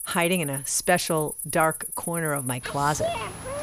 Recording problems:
animal sounds; loud; throughout; 6 dB below the speech
high-pitched whine; noticeable; throughout; 10.5 kHz, 15 dB below the speech

